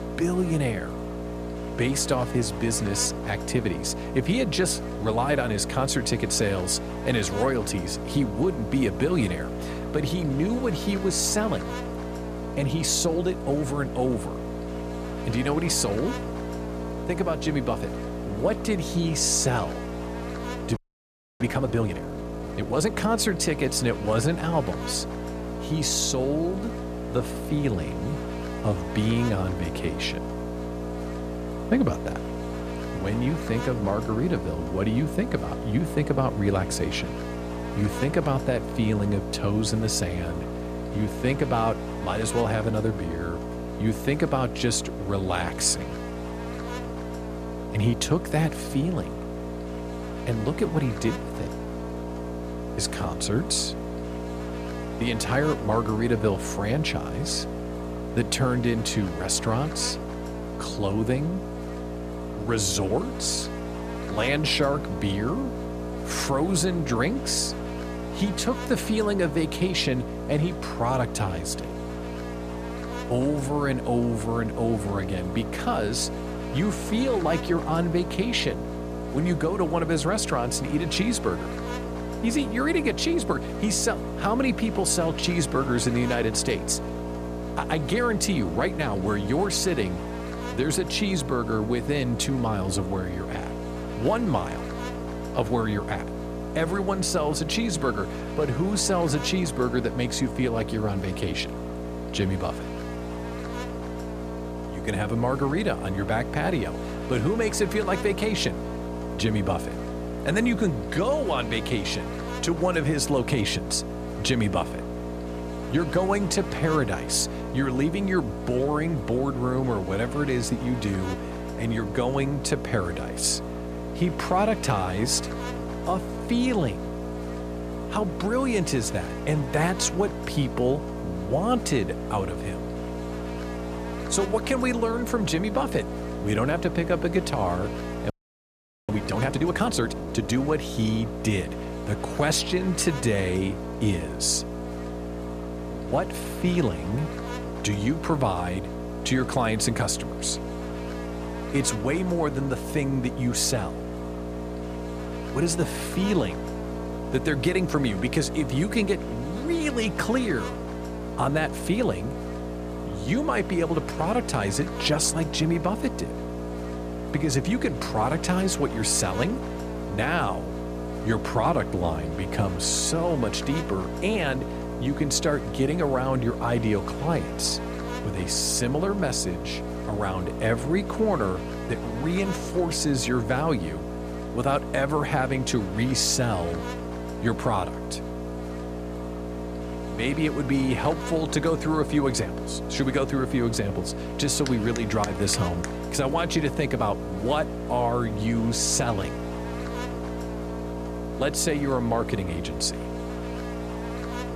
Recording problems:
electrical hum; loud; throughout; 60 Hz, 7 dB below the speech
audio freezing; at 21 s for 0.5 s and at 2:18 for 1 s

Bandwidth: 14.5 kHz